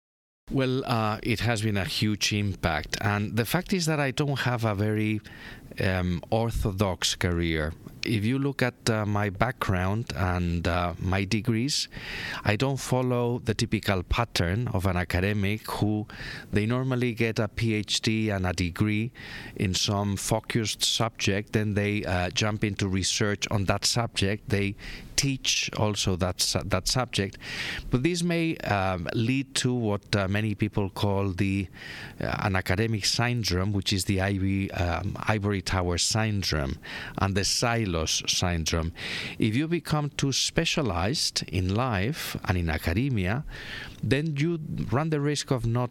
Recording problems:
squashed, flat; heavily

